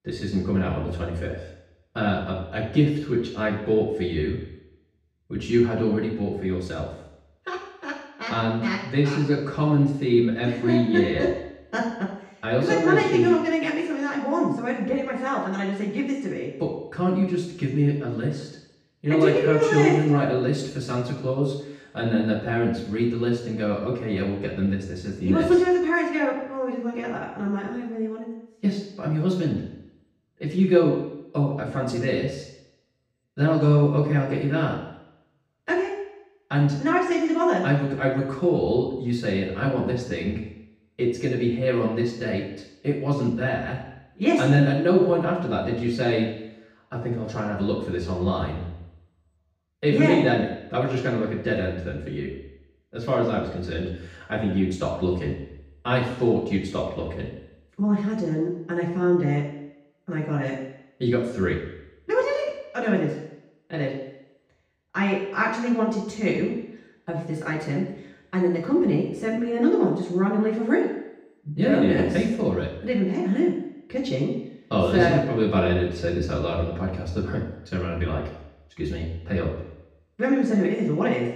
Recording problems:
off-mic speech; far
room echo; noticeable; dies away in 0.8 s

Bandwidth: 15.5 kHz